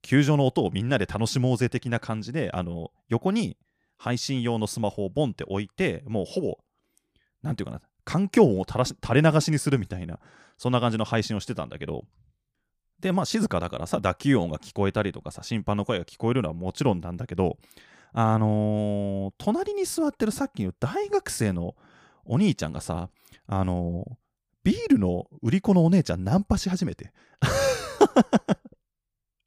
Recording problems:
none

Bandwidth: 15 kHz